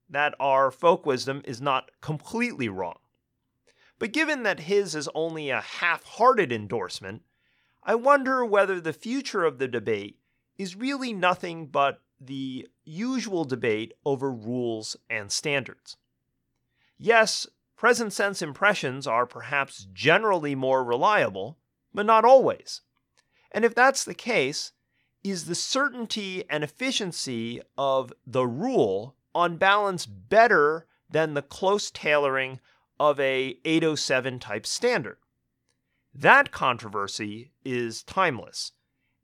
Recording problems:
none

